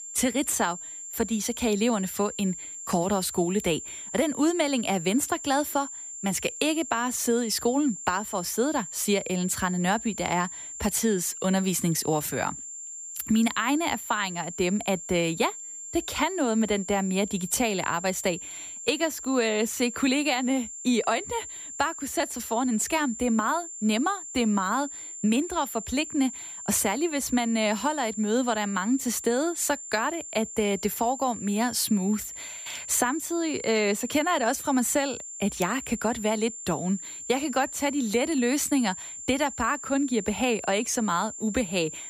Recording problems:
high-pitched whine; loud; throughout; 7.5 kHz, 10 dB below the speech

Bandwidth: 15 kHz